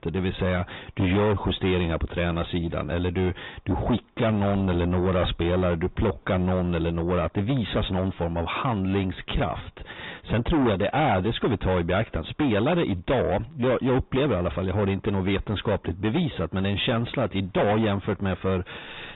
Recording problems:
distortion; heavy; 7 dB below the speech
high frequencies cut off; severe; nothing above 3.5 kHz
garbled, watery; slightly
uneven, jittery; slightly; from 1 to 18 s

